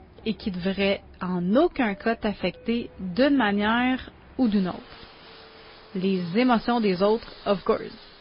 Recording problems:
garbled, watery; slightly; nothing above 5 kHz
high frequencies cut off; slight
train or aircraft noise; faint; throughout; 25 dB below the speech

